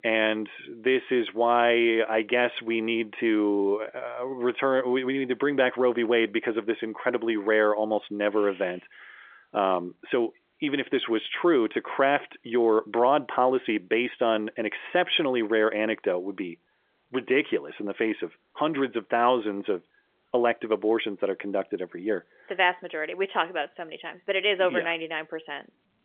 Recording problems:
phone-call audio; nothing above 3.5 kHz

